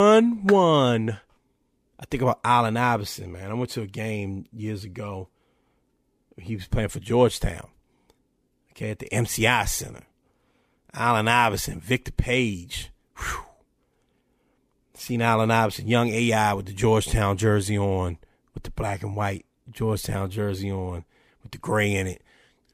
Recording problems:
abrupt cut into speech; at the start

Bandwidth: 15 kHz